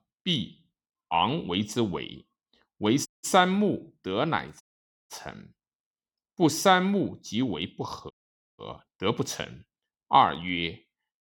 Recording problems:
audio cutting out; at 3 s, at 4.5 s and at 8 s

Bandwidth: 18 kHz